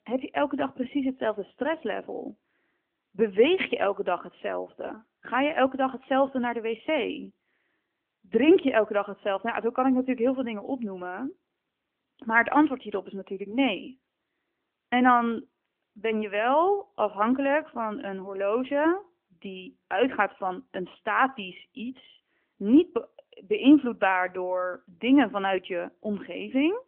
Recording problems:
phone-call audio; nothing above 3 kHz

